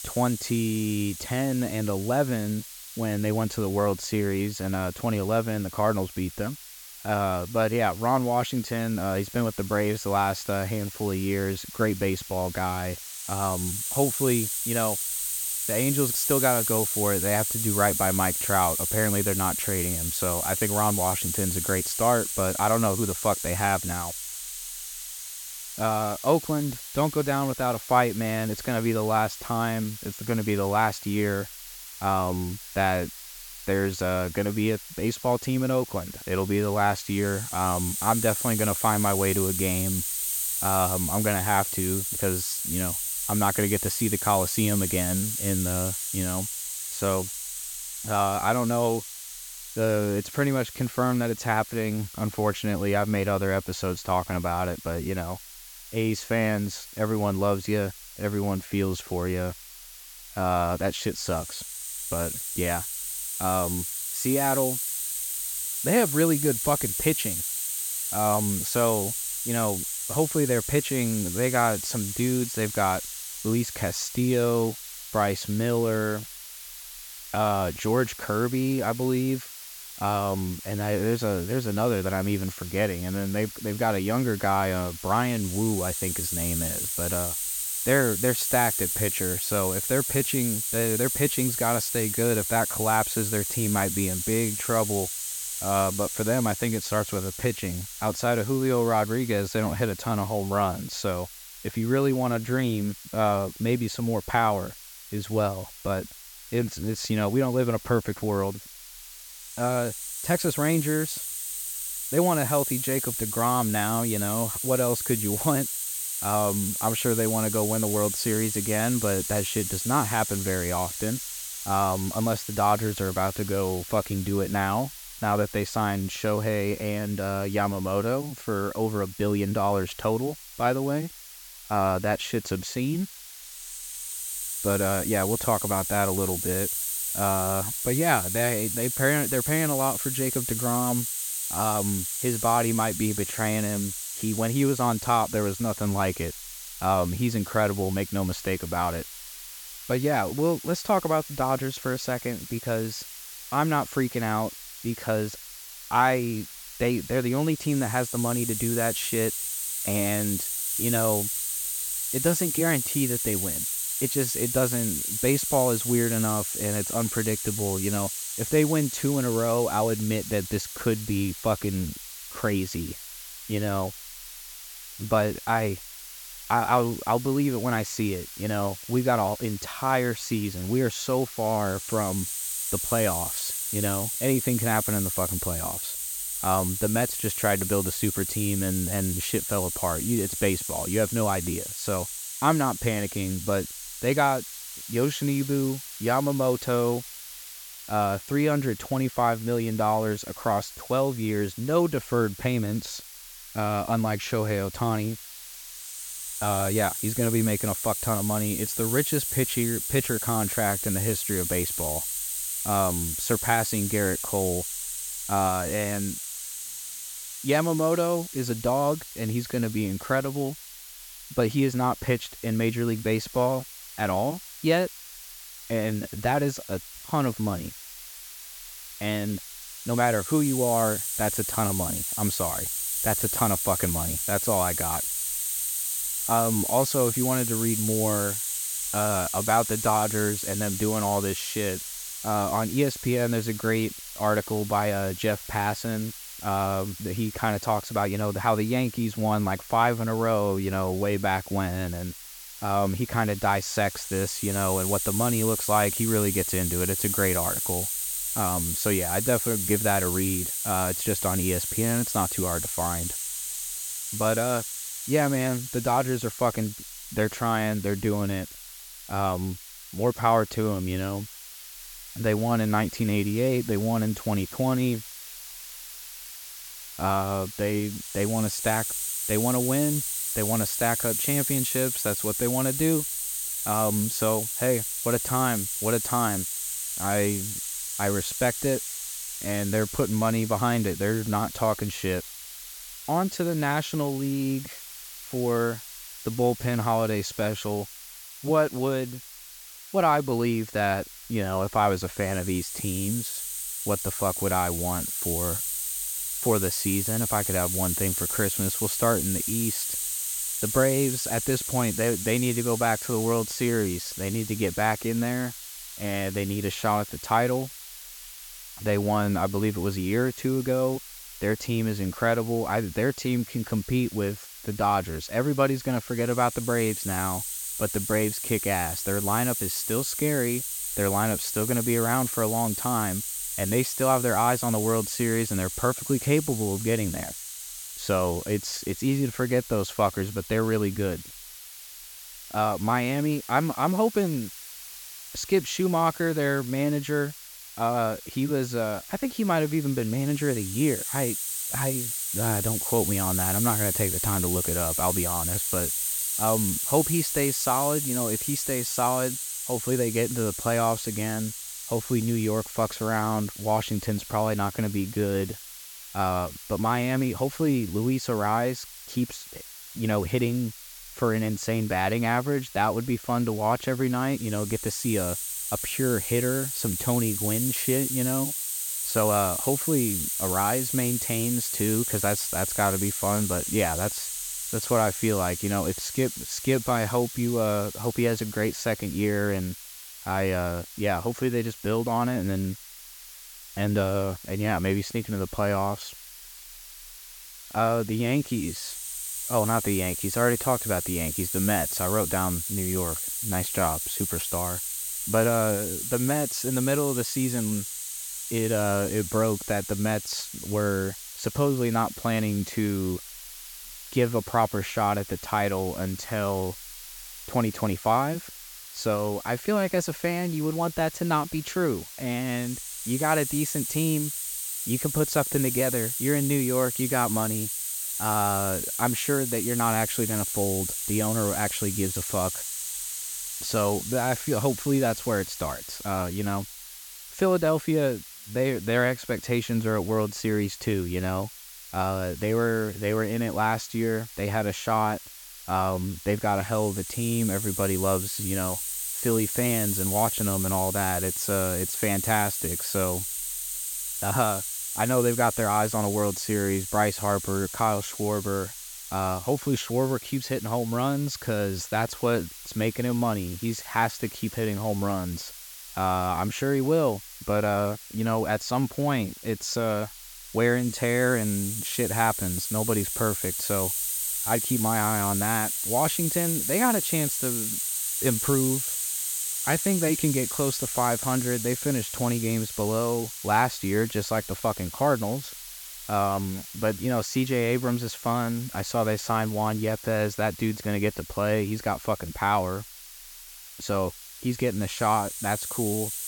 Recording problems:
hiss; loud; throughout; 4 dB below the speech

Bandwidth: 17.5 kHz